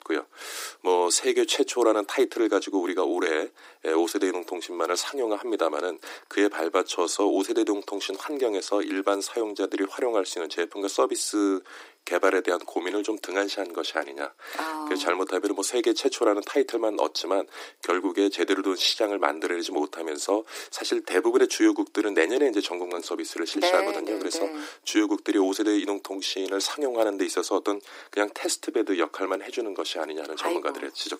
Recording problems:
thin; somewhat; fading below 300 Hz

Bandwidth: 15.5 kHz